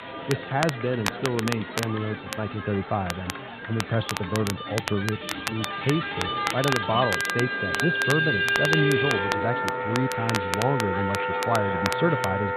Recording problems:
high frequencies cut off; severe; nothing above 4 kHz
background music; very loud; throughout; 1 dB above the speech
chatter from many people; loud; throughout; 9 dB below the speech
crackle, like an old record; loud; 5 dB below the speech

